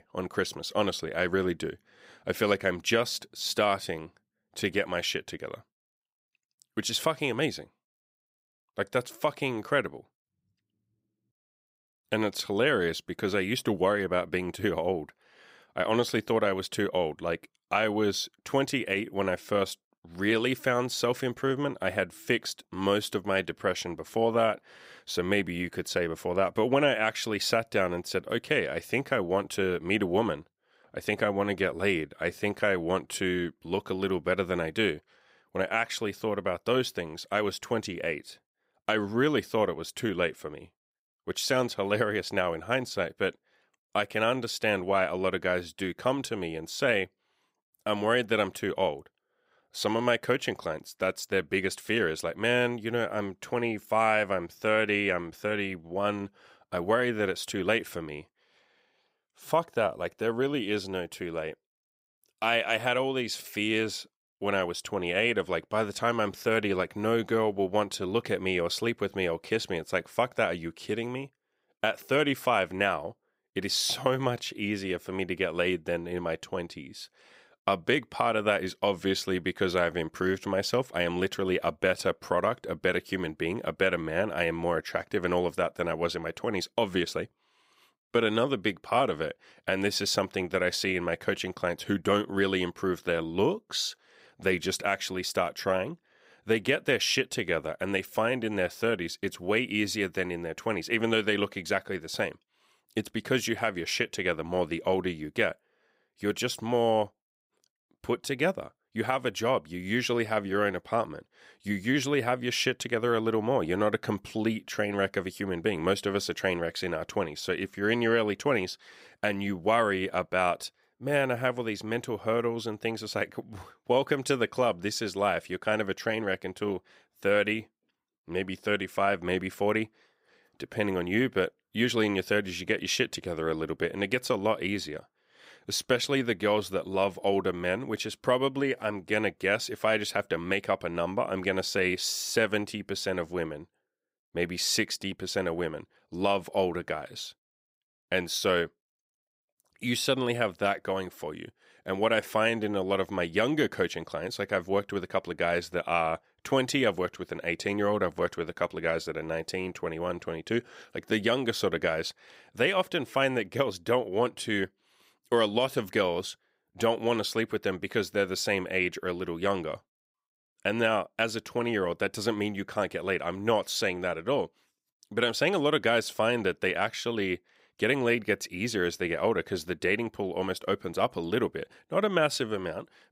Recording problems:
none

